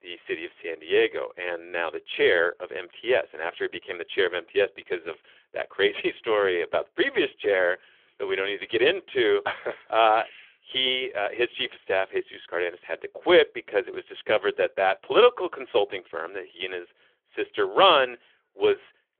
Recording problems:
phone-call audio; nothing above 3.5 kHz

